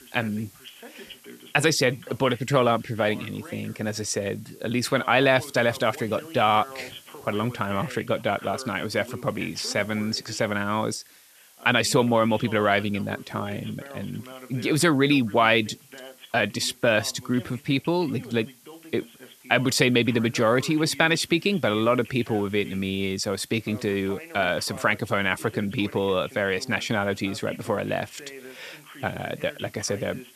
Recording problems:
voice in the background; noticeable; throughout; 20 dB below the speech
hiss; faint; throughout; 25 dB below the speech

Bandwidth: 14 kHz